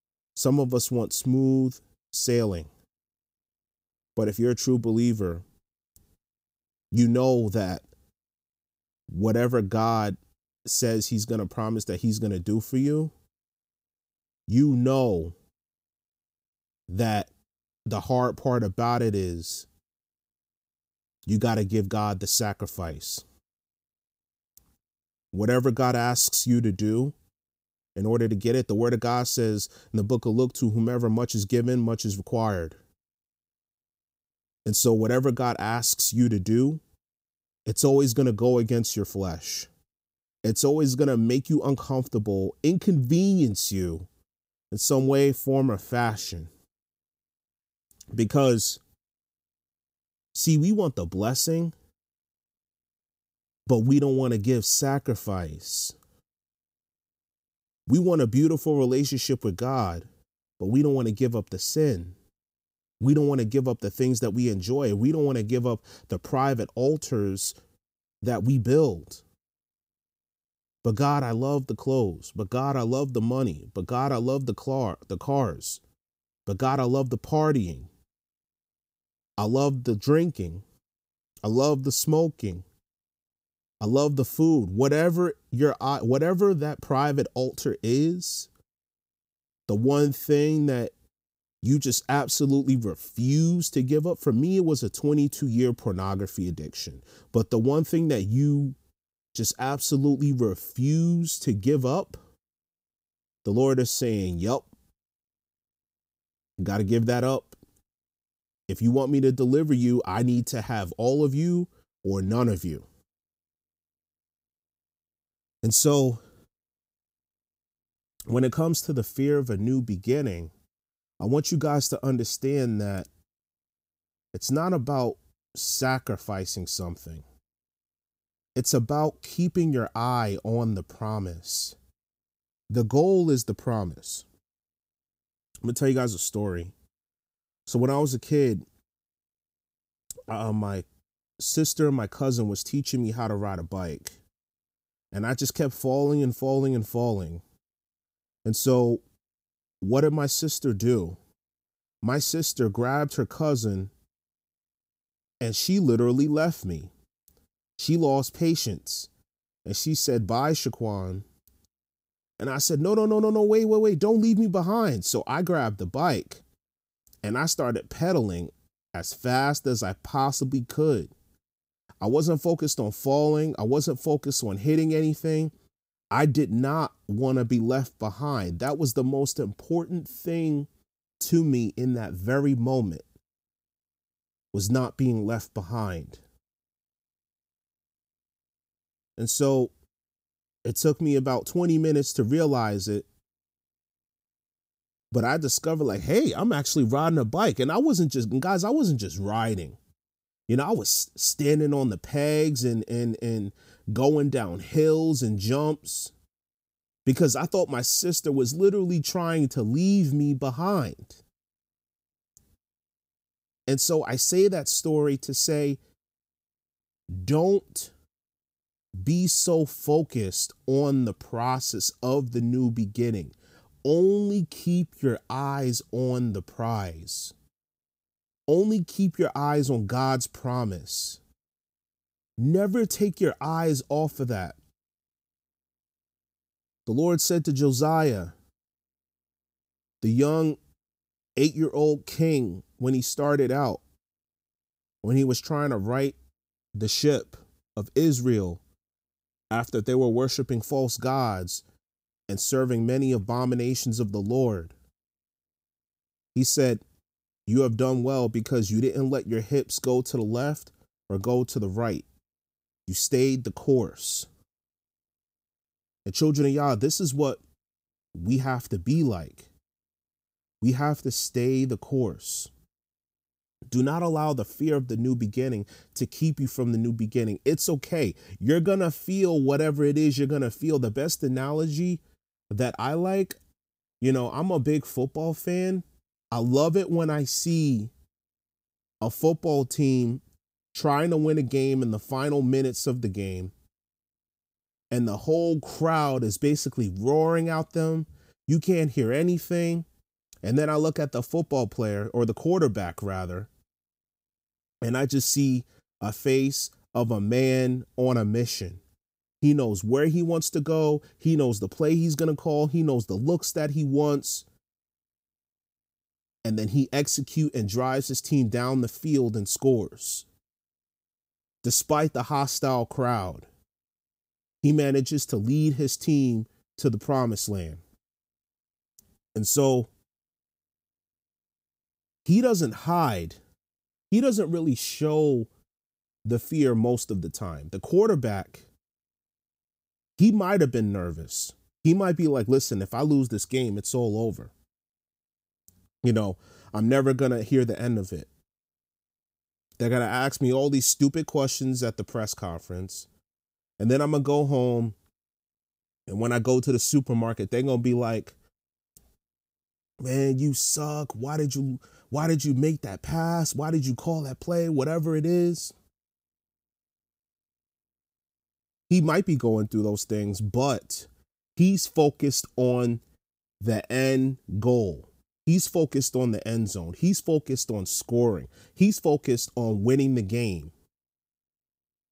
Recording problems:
none

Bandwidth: 15.5 kHz